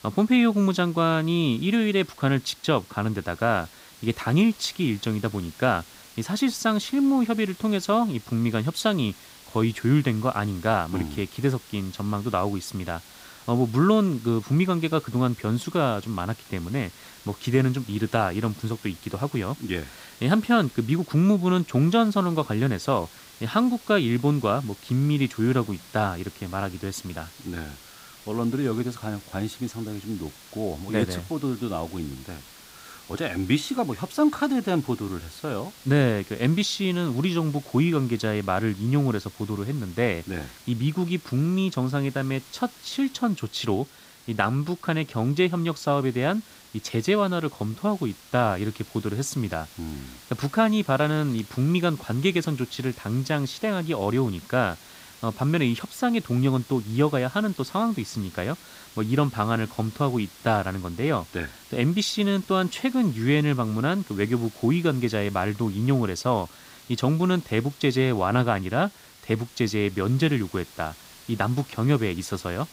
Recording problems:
hiss; faint; throughout; 20 dB below the speech

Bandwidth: 15.5 kHz